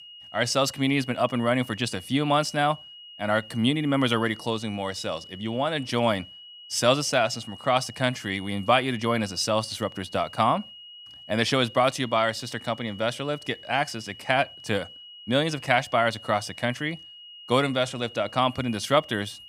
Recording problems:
high-pitched whine; noticeable; throughout; 3 kHz, 15 dB below the speech

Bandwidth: 15.5 kHz